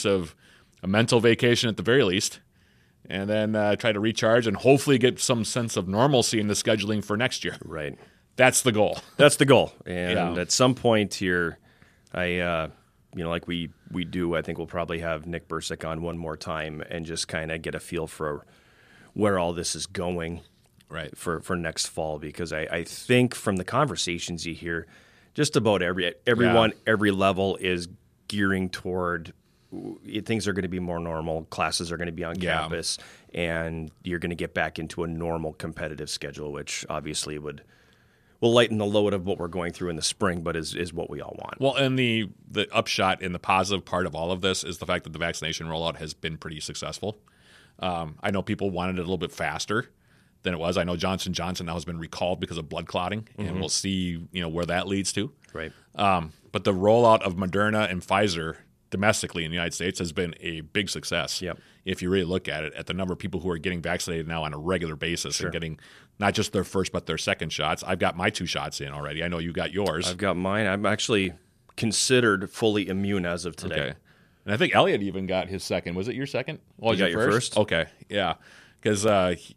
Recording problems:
abrupt cut into speech; at the start

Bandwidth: 14.5 kHz